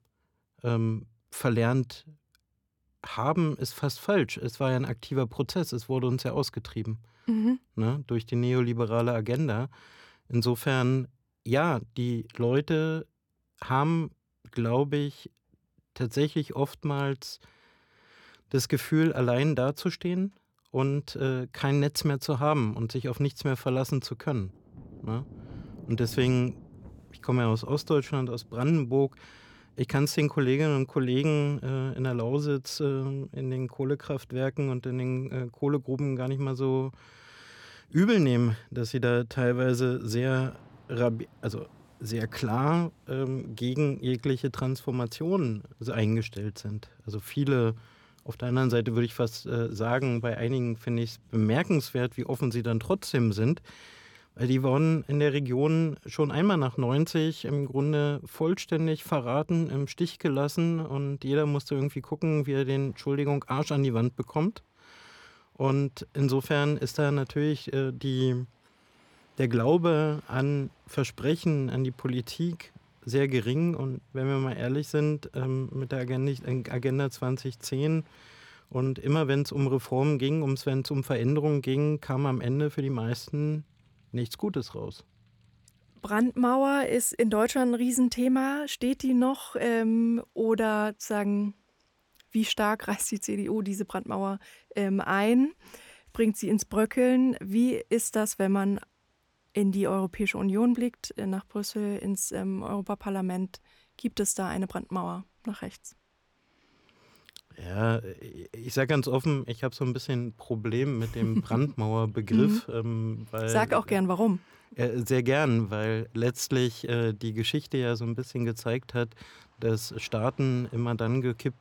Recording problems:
rain or running water; faint; from 25 s on; 30 dB below the speech

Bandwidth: 18 kHz